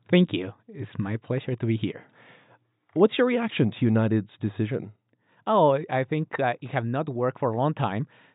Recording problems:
high frequencies cut off; severe; nothing above 4 kHz

